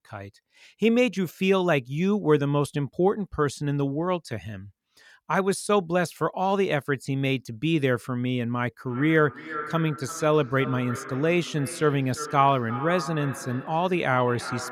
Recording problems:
echo of what is said; noticeable; from 9 s on; 350 ms later, 10 dB below the speech

